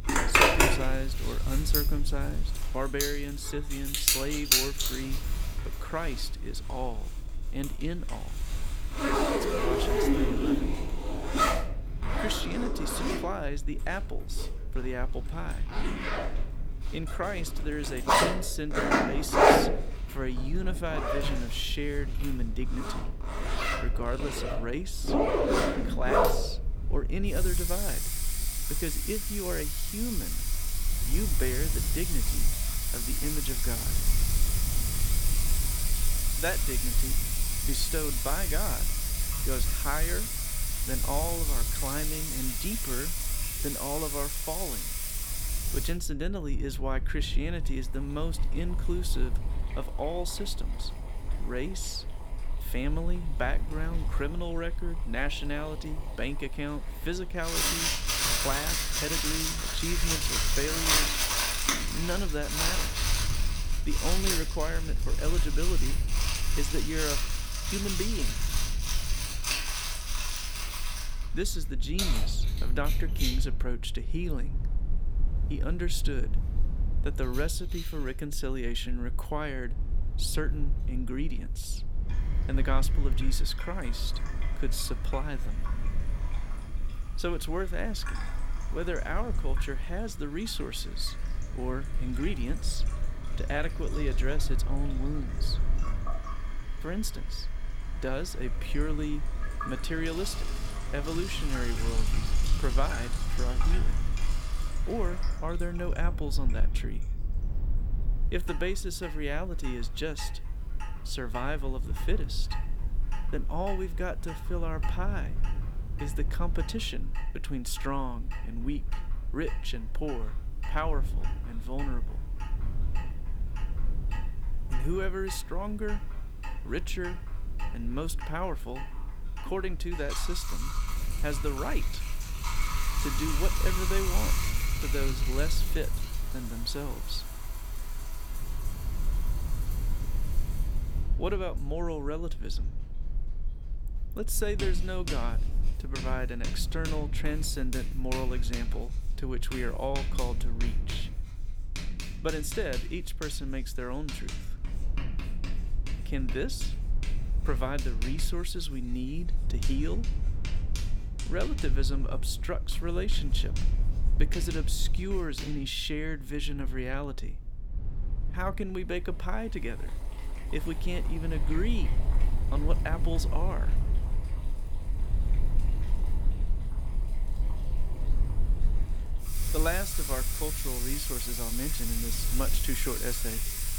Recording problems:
household noises; very loud; throughout; 5 dB above the speech
low rumble; noticeable; throughout; 15 dB below the speech

